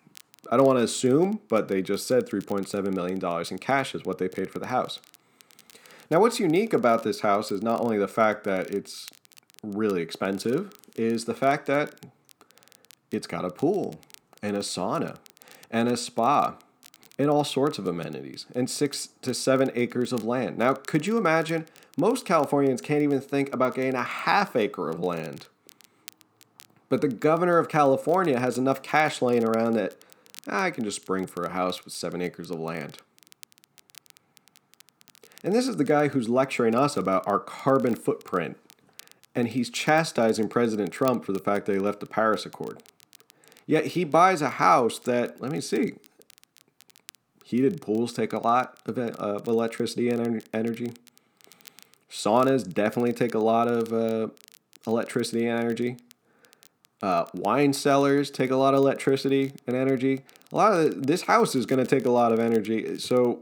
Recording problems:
crackle, like an old record; faint; 30 dB below the speech

